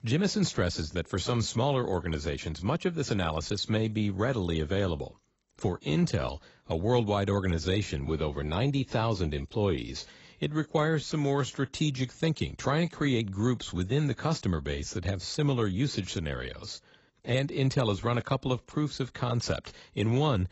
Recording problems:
garbled, watery; badly; nothing above 7.5 kHz

